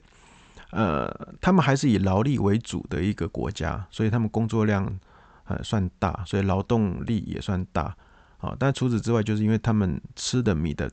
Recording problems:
high frequencies cut off; noticeable; nothing above 8 kHz

